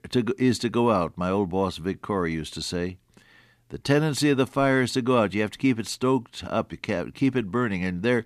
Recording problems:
none

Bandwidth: 14.5 kHz